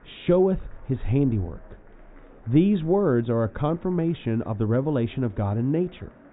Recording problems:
high frequencies cut off; severe; nothing above 4 kHz
muffled; very slightly; fading above 1.5 kHz
murmuring crowd; faint; throughout; 30 dB below the speech

